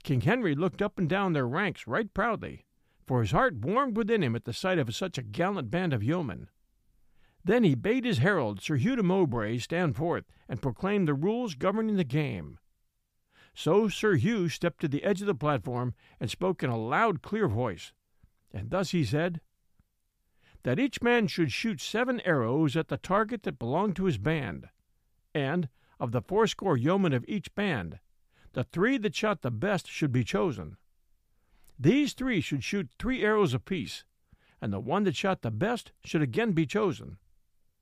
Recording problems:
none

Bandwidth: 15 kHz